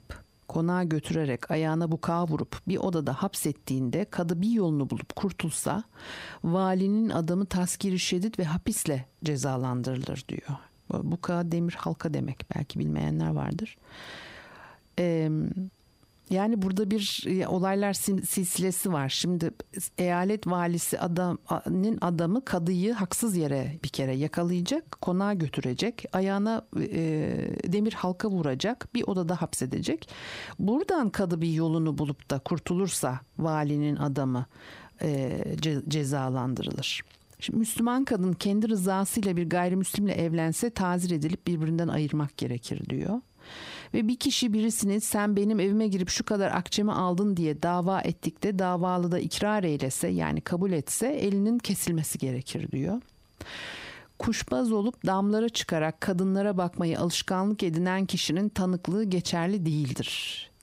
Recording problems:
squashed, flat; heavily

